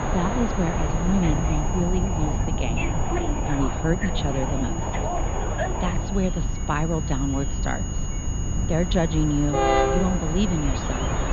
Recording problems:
muffled; slightly; fading above 4 kHz
train or aircraft noise; loud; throughout; 4 dB below the speech
high-pitched whine; noticeable; throughout; 6.5 kHz, 10 dB below the speech
low rumble; noticeable; throughout; 10 dB below the speech

